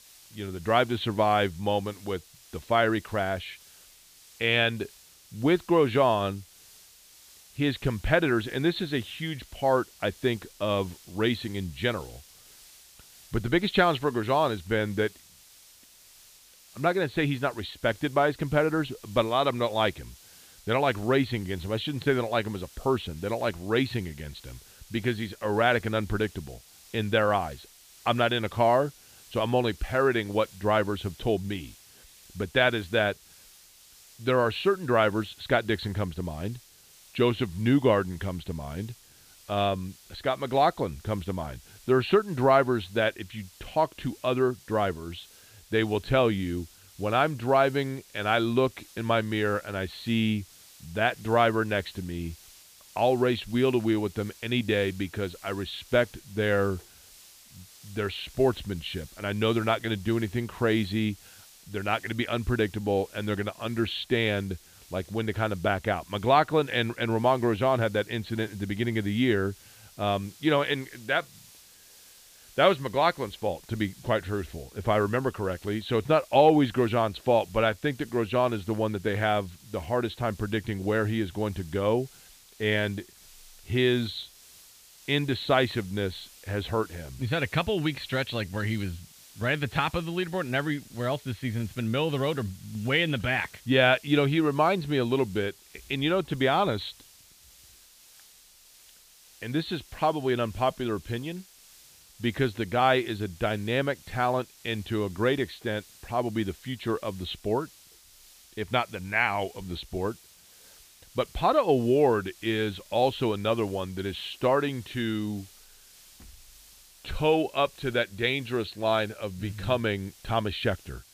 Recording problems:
high frequencies cut off; severe; nothing above 4.5 kHz
hiss; faint; throughout; 25 dB below the speech

